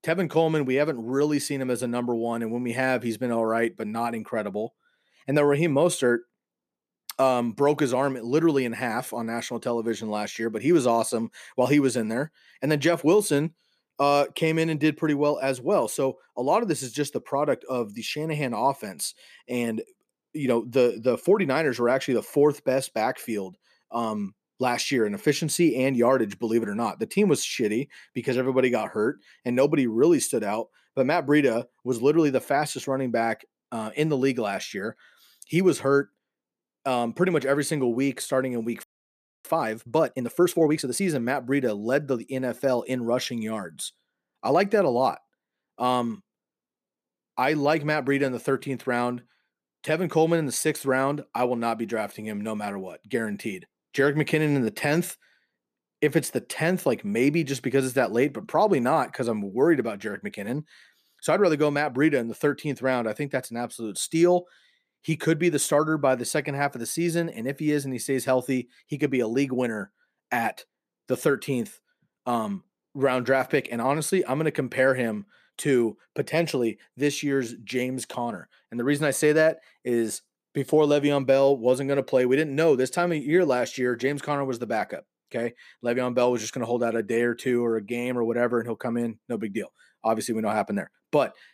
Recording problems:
audio freezing; at 39 s for 0.5 s

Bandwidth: 14.5 kHz